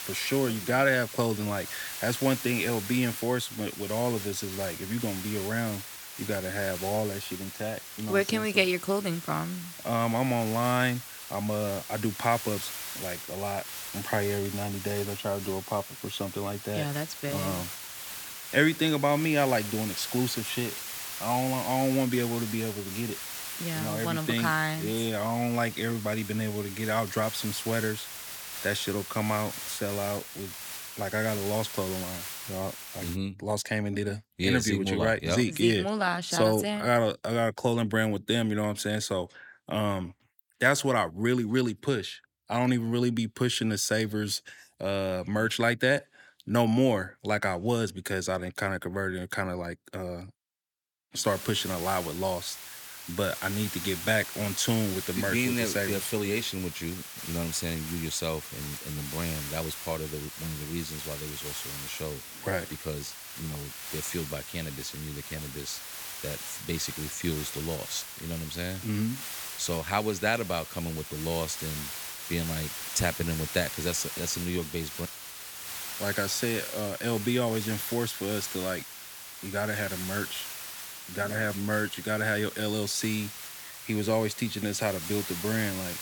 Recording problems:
hiss; loud; until 33 s and from 51 s on; 7 dB below the speech

